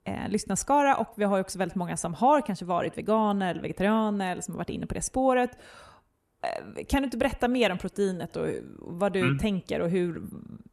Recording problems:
echo of what is said; faint; throughout; 90 ms later, 25 dB below the speech

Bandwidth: 13.5 kHz